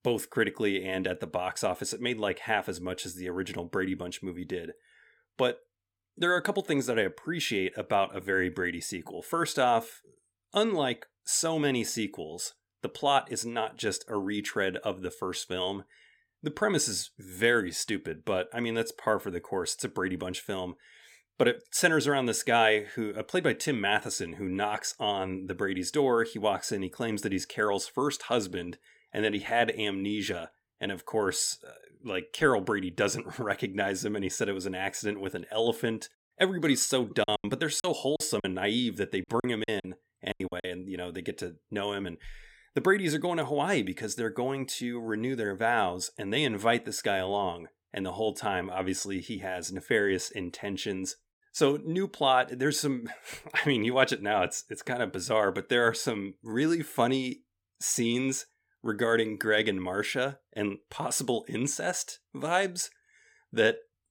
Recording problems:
choppy; very; from 37 to 41 s; 14% of the speech affected

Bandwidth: 17 kHz